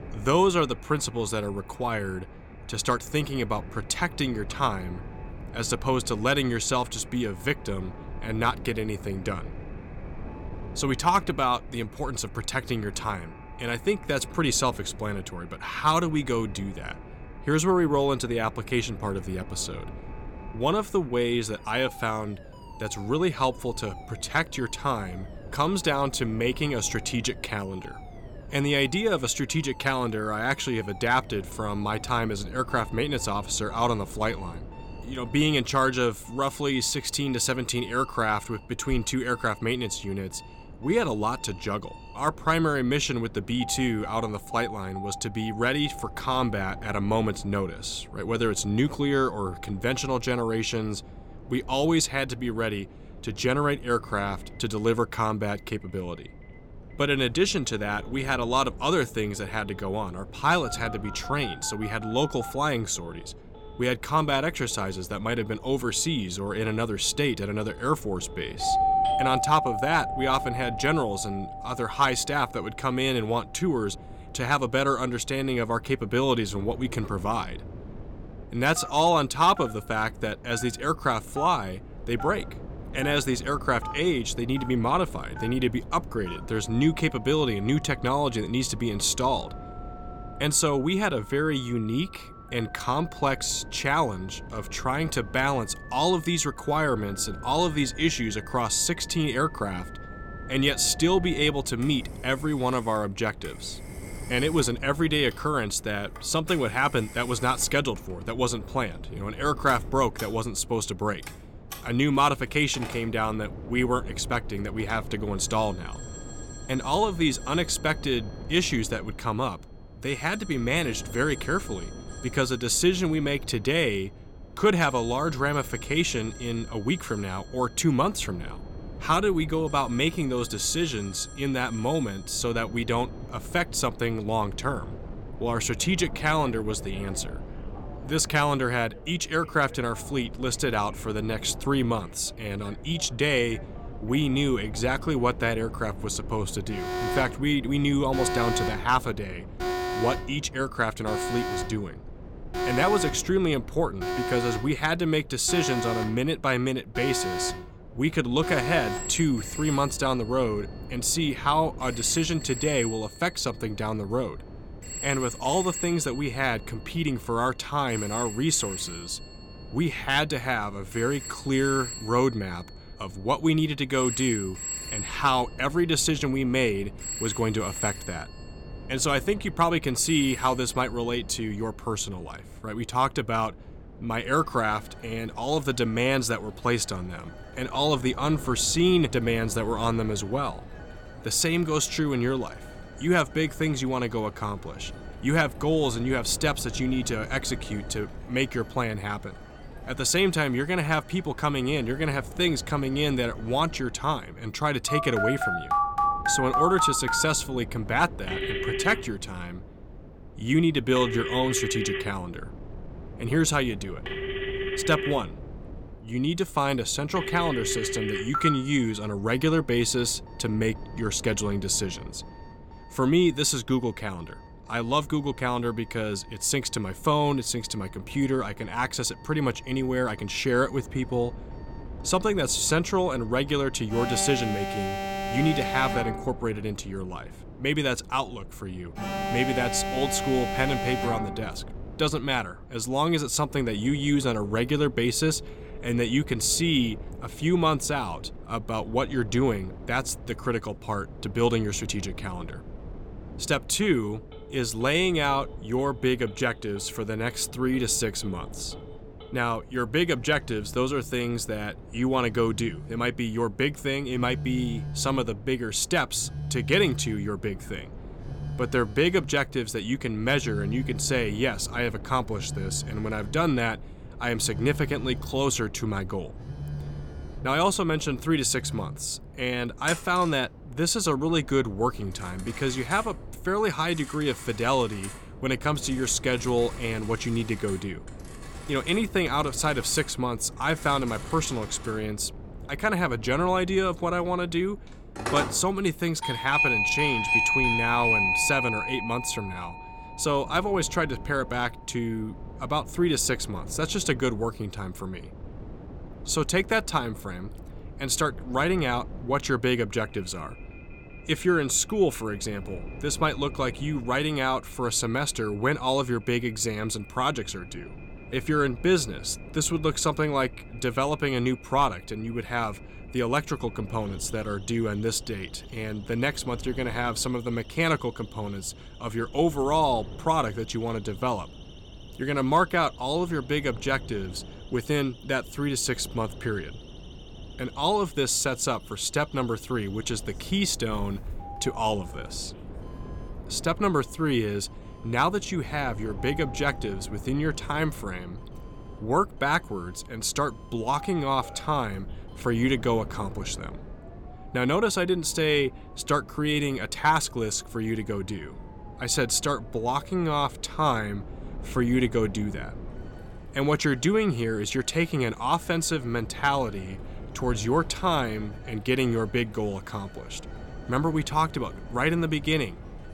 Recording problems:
alarms or sirens; loud; throughout; 7 dB below the speech
wind noise on the microphone; occasional gusts; 20 dB below the speech

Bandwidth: 17 kHz